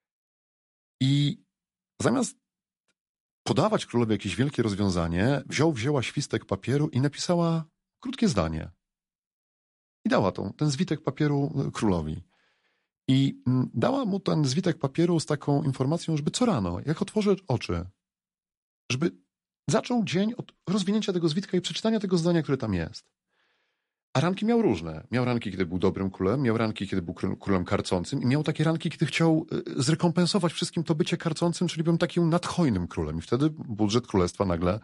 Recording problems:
garbled, watery; slightly; nothing above 11 kHz

